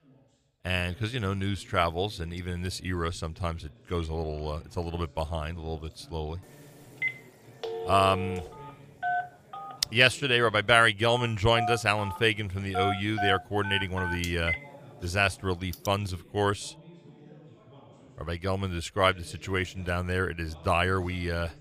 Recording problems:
background chatter; faint; throughout; 2 voices, 25 dB below the speech
phone ringing; noticeable; from 7 to 16 s; peak 3 dB below the speech

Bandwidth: 15 kHz